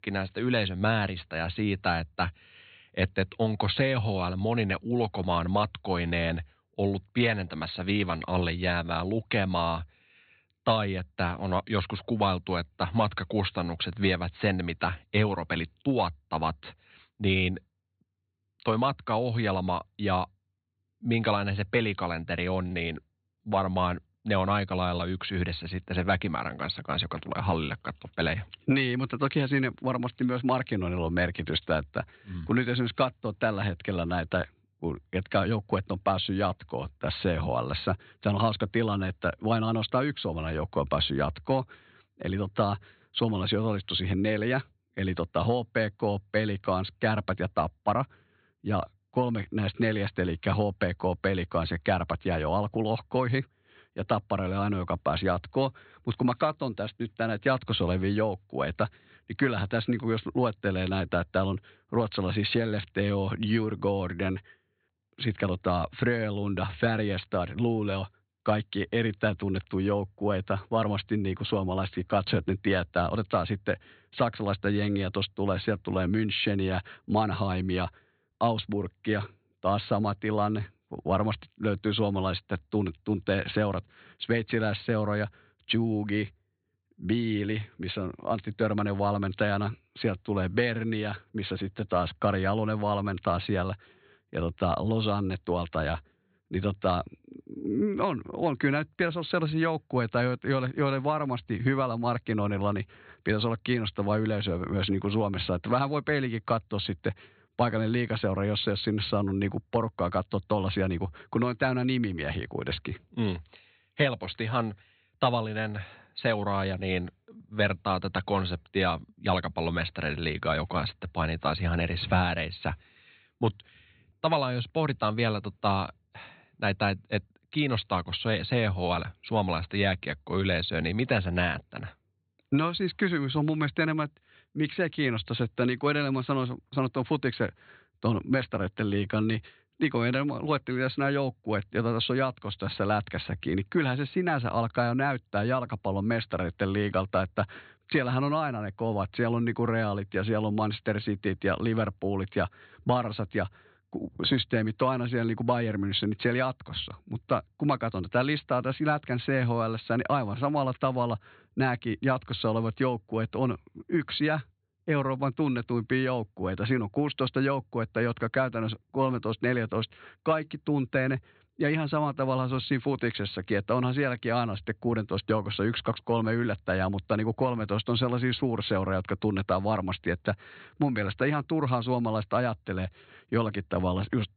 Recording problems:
high frequencies cut off; severe; nothing above 4.5 kHz

